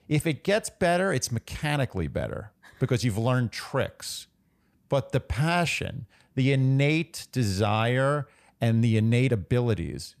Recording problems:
none

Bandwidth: 14.5 kHz